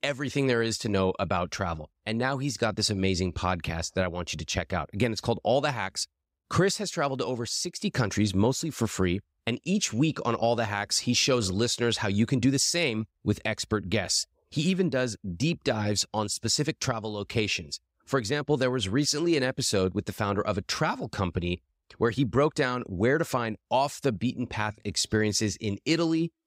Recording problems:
none

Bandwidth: 15.5 kHz